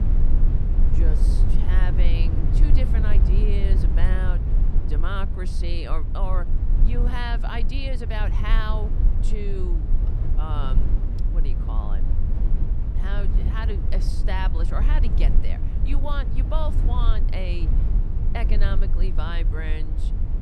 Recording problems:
low rumble; loud; throughout; 6 dB below the speech

